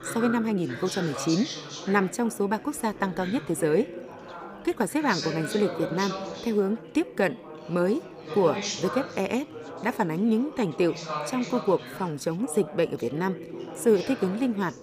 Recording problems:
chatter from many people; loud; throughout; 9 dB below the speech

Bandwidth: 15 kHz